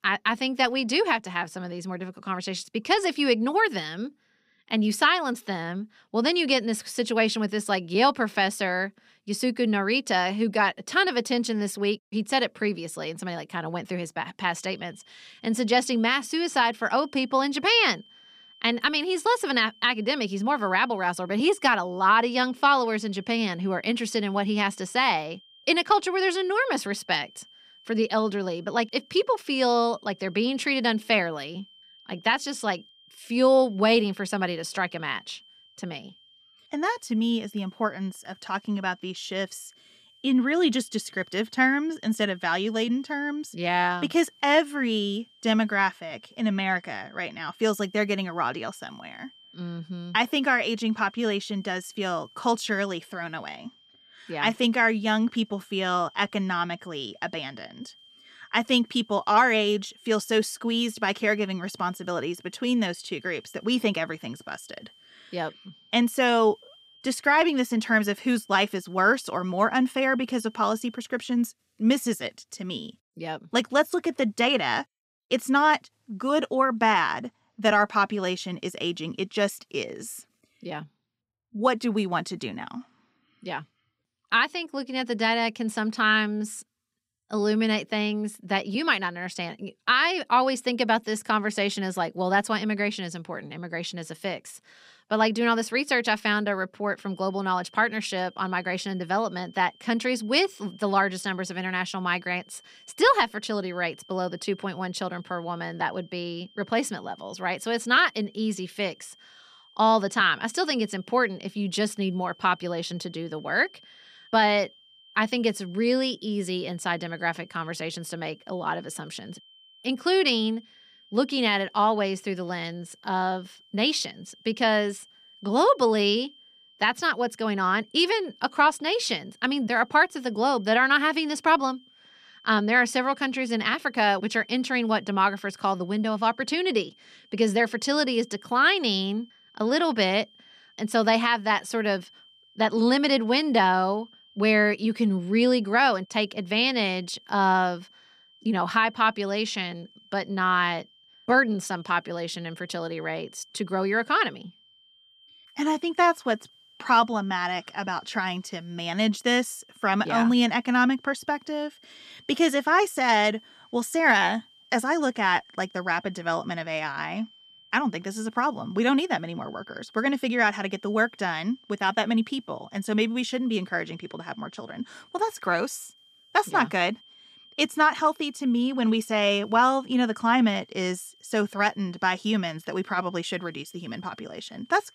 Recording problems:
high-pitched whine; faint; from 14 s to 1:11 and from 1:37 on; 3 kHz, 30 dB below the speech

